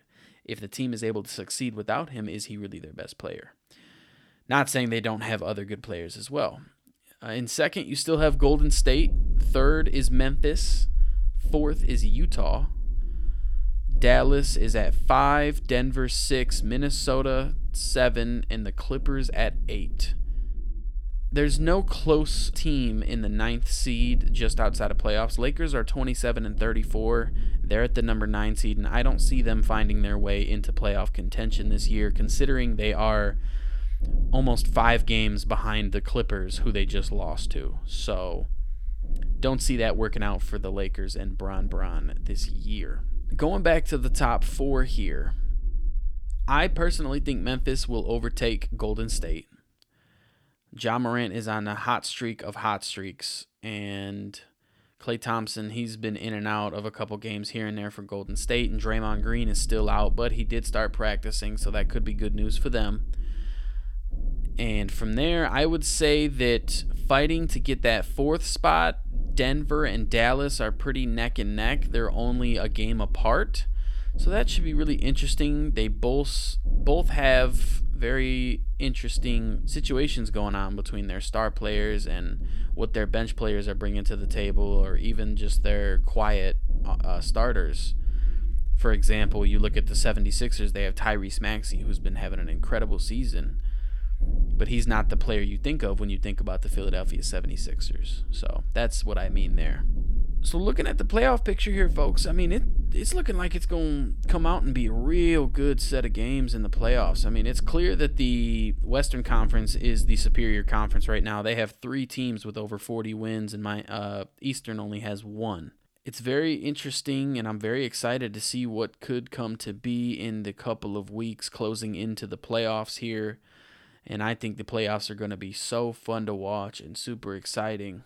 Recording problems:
low rumble; faint; from 8 to 49 s and from 58 s to 1:51; 25 dB below the speech

